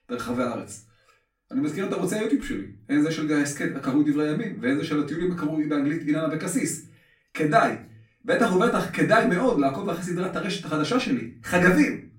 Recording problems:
off-mic speech; far
room echo; very slight; dies away in 0.3 s

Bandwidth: 16 kHz